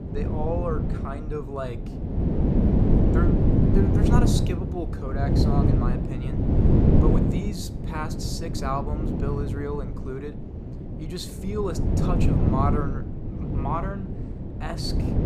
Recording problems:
wind noise on the microphone; heavy; 1 dB above the speech

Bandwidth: 15 kHz